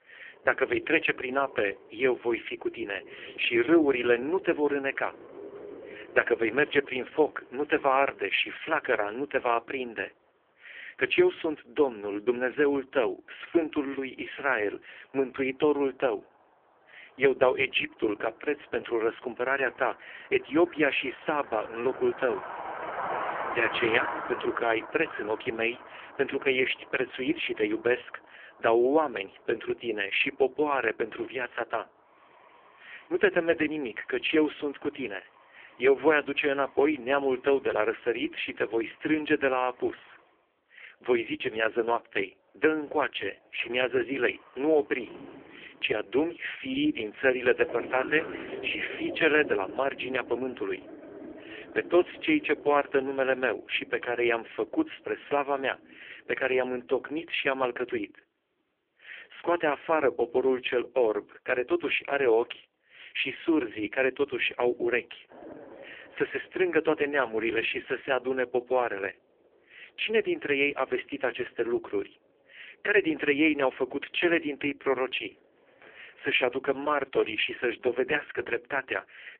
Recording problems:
phone-call audio; poor line; nothing above 3 kHz
traffic noise; noticeable; throughout; 15 dB below the speech

